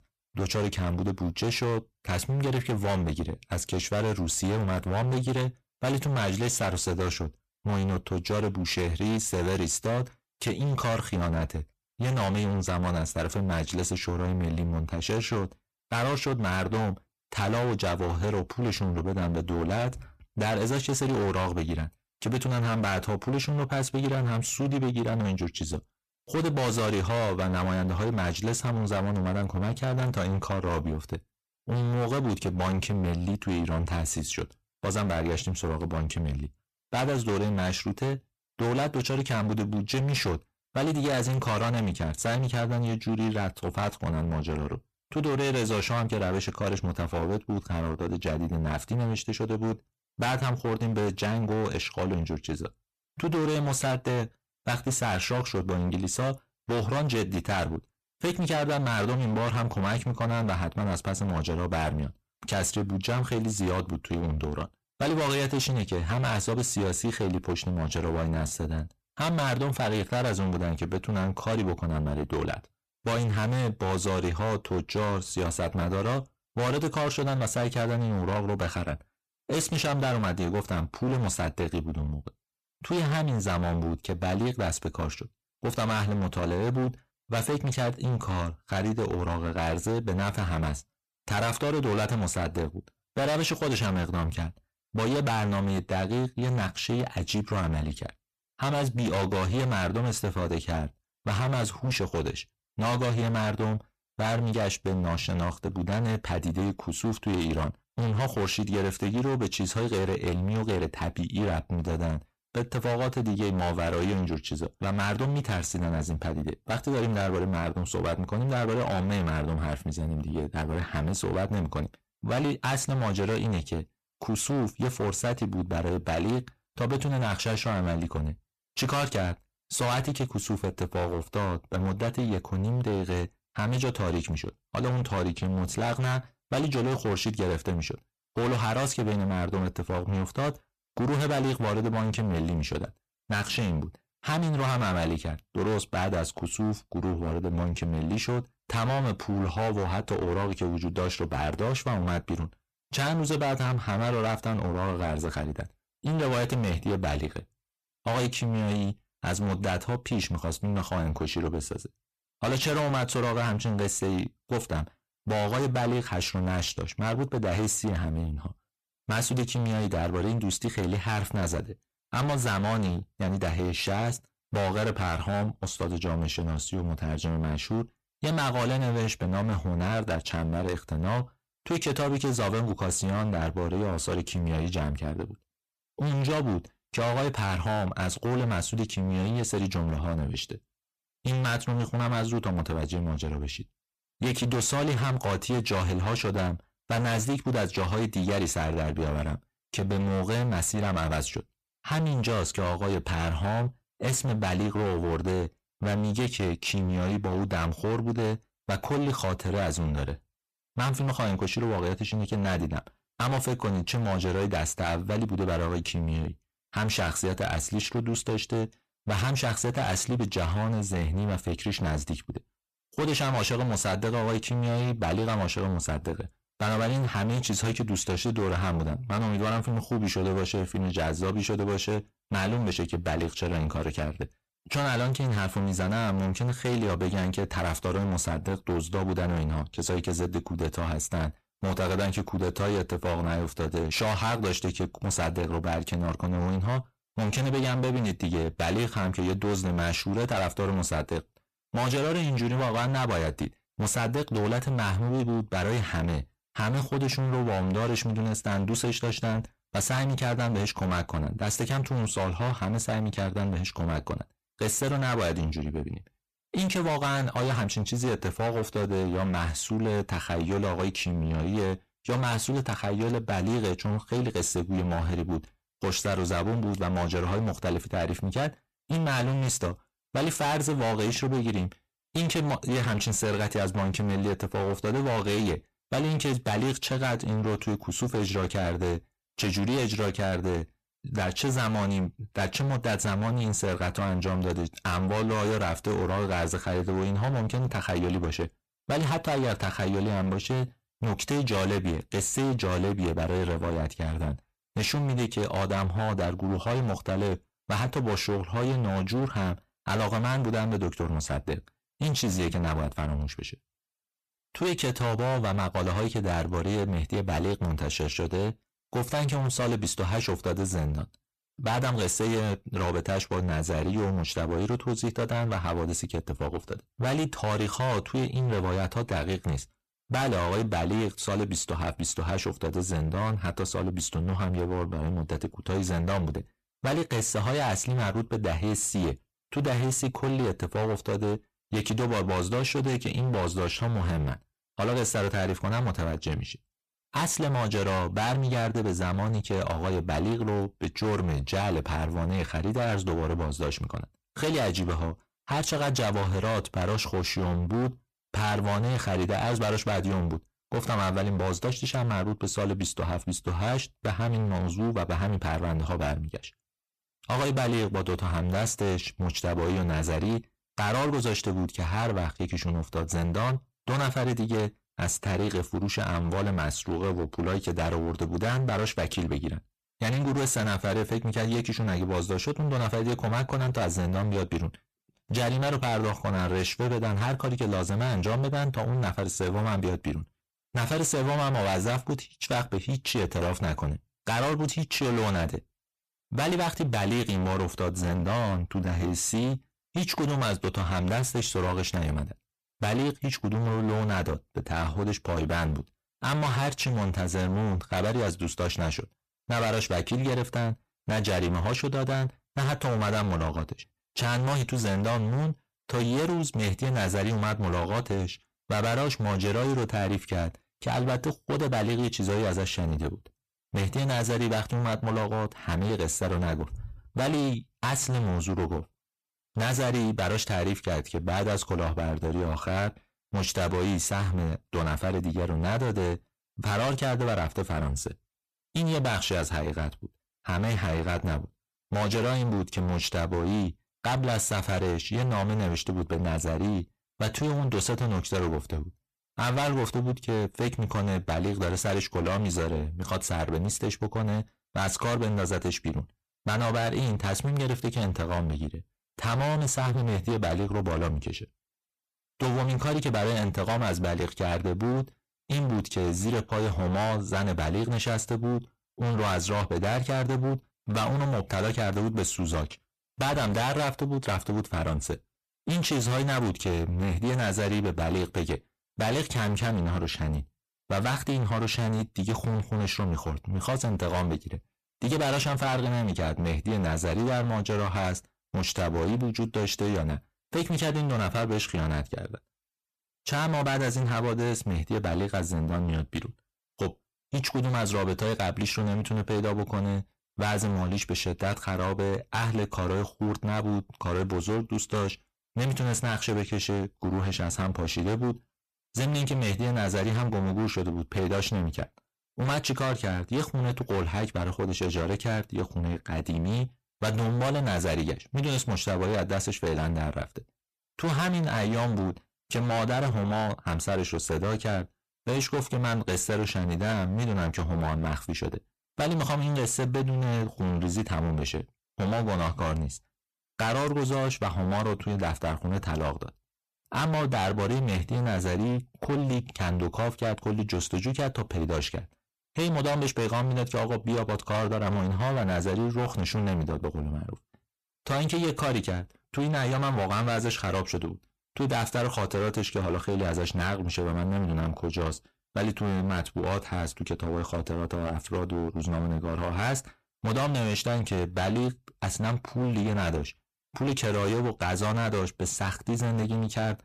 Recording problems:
distortion; heavy; 27% of the sound clipped

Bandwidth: 14.5 kHz